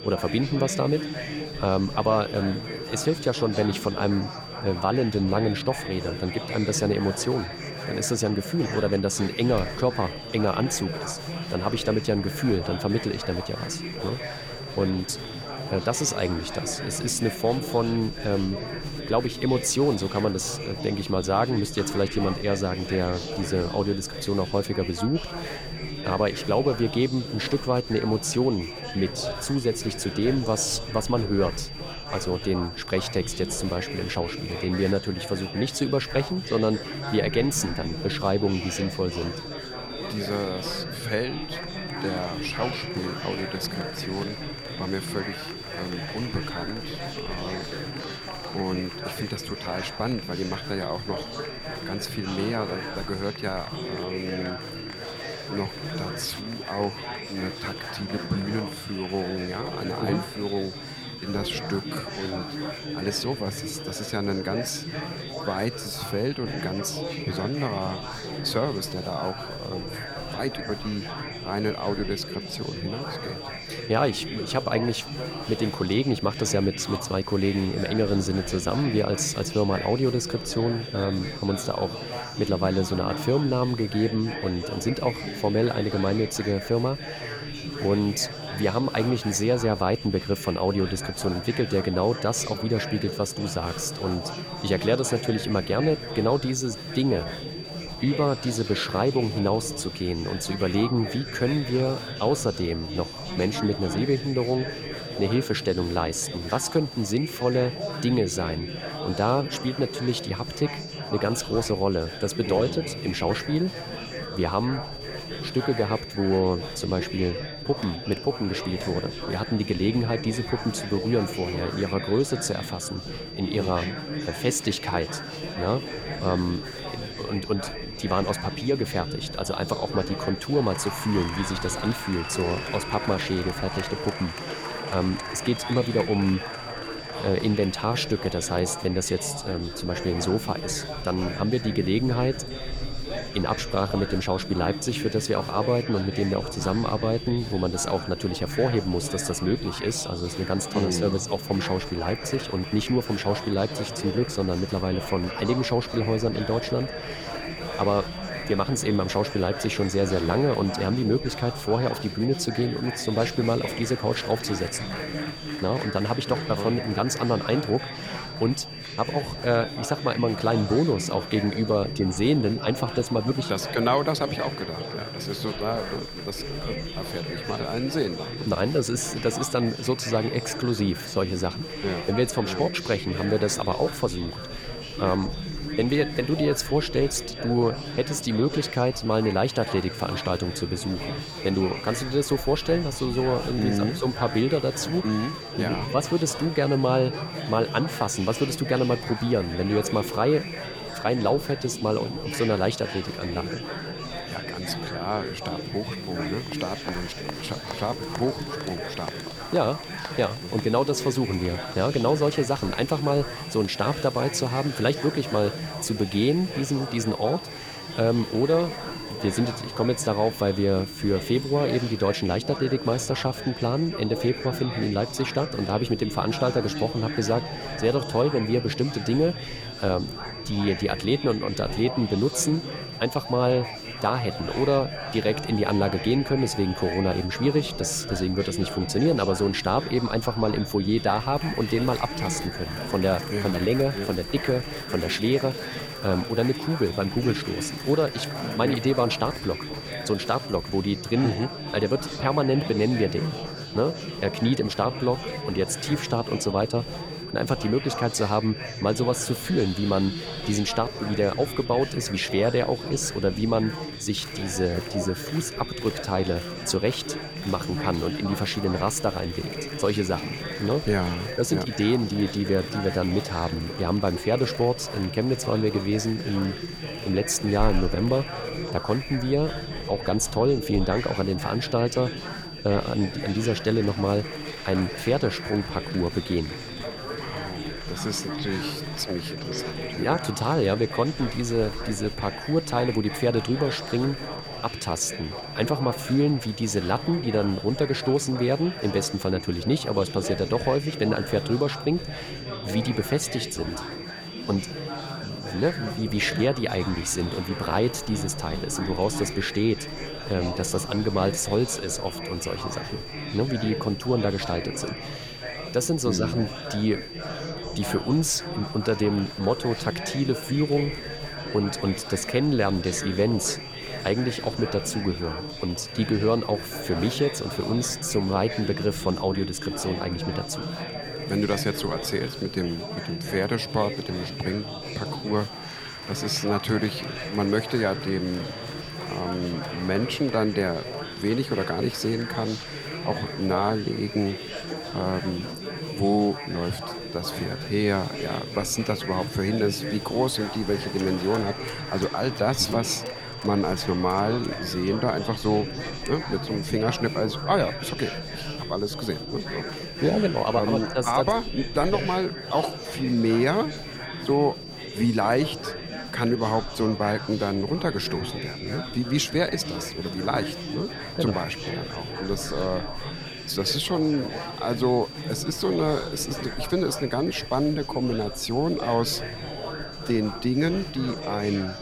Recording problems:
chatter from many people; loud; throughout; 8 dB below the speech
high-pitched whine; noticeable; throughout; 4.5 kHz, 10 dB below the speech
wind in the background; faint; throughout; 25 dB below the speech

